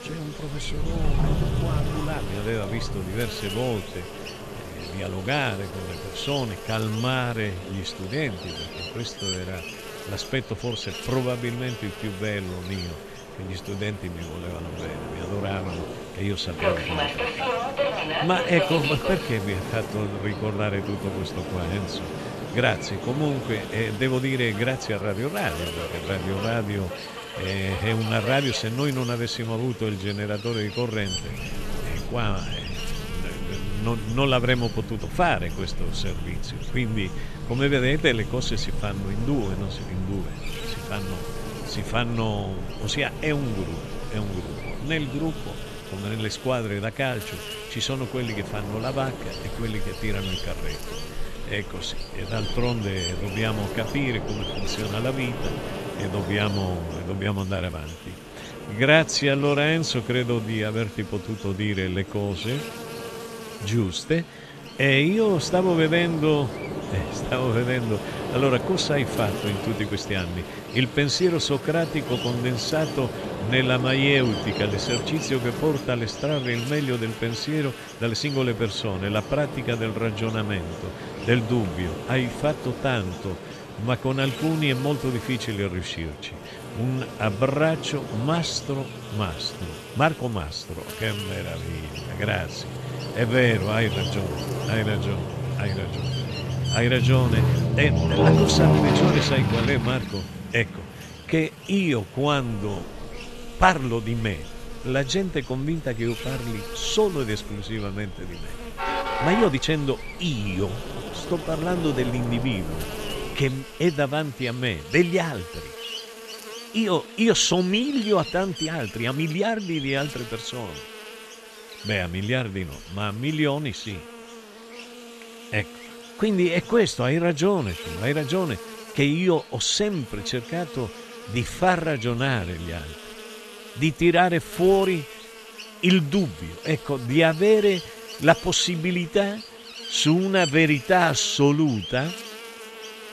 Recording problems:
train or aircraft noise; loud; until 1:53; 6 dB below the speech
electrical hum; noticeable; throughout; 50 Hz, 10 dB below the speech
uneven, jittery; strongly; from 7 s to 2:17

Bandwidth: 13.5 kHz